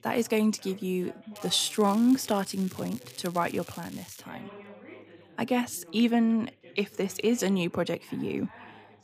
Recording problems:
crackling; noticeable; from 1.5 to 4 s; 20 dB below the speech
background chatter; faint; throughout; 2 voices, 20 dB below the speech

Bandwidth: 15 kHz